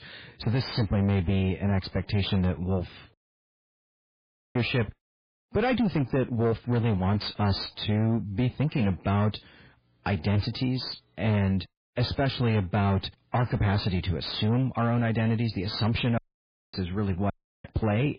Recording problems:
garbled, watery; badly; nothing above 4.5 kHz
distortion; slight; 10 dB below the speech
audio cutting out; at 3 s for 1.5 s, at 16 s for 0.5 s and at 17 s

